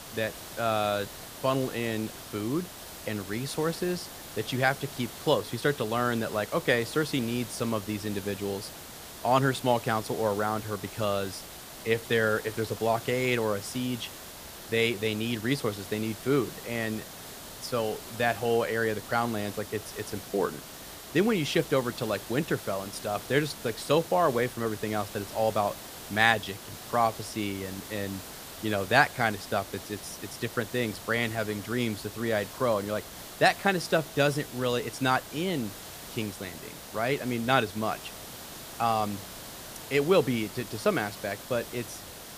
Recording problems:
hiss; noticeable; throughout; 10 dB below the speech

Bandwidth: 15 kHz